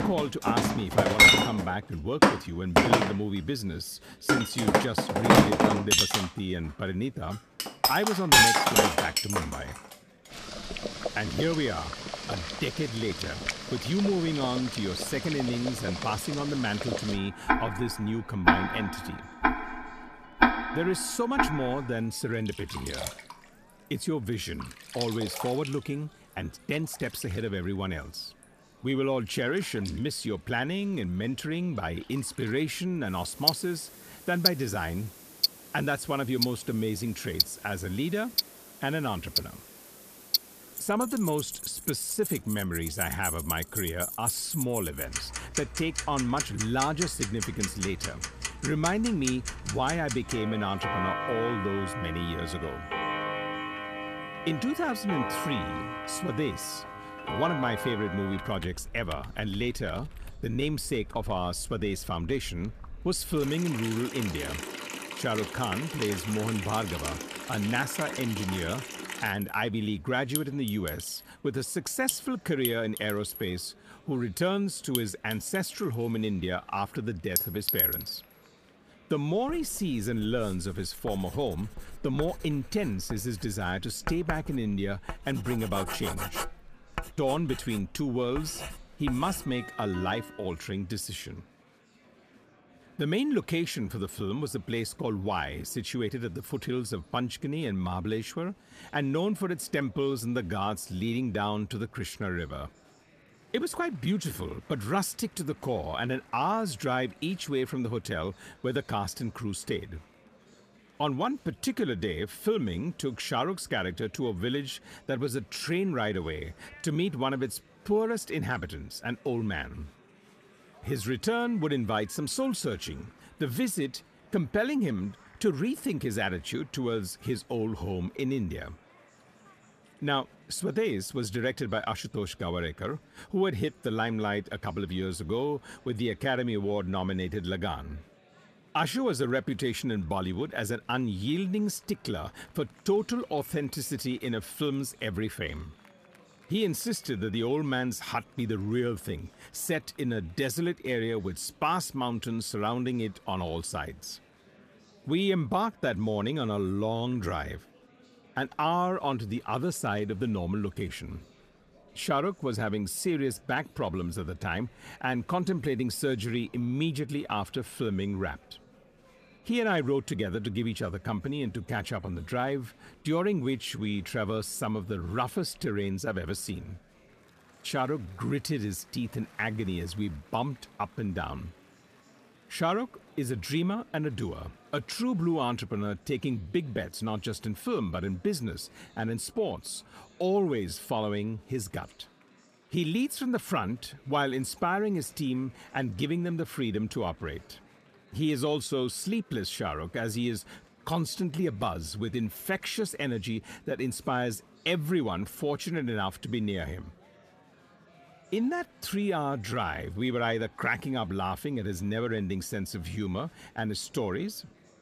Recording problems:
household noises; very loud; until 1:30; 2 dB above the speech
murmuring crowd; faint; throughout; 25 dB below the speech

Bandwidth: 14.5 kHz